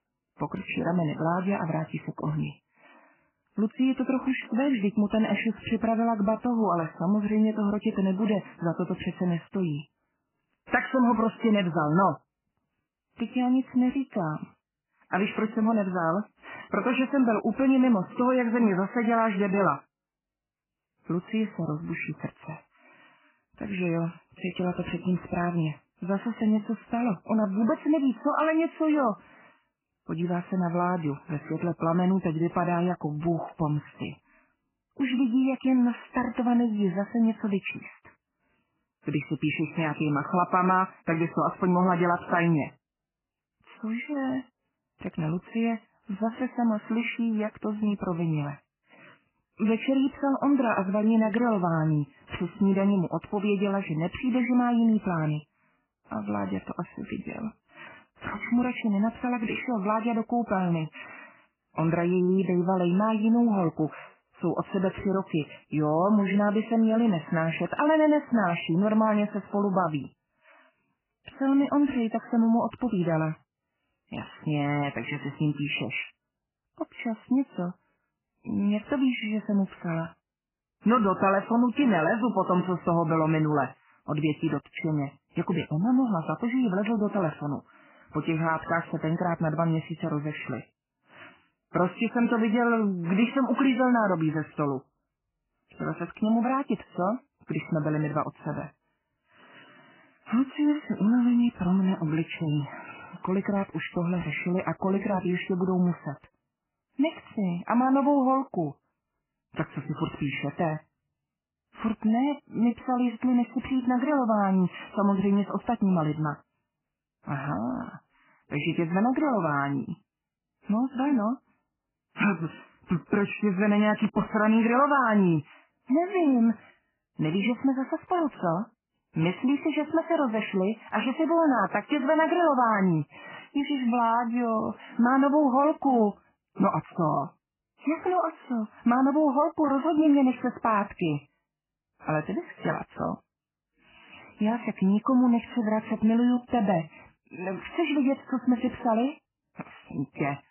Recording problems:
garbled, watery; badly; nothing above 3 kHz

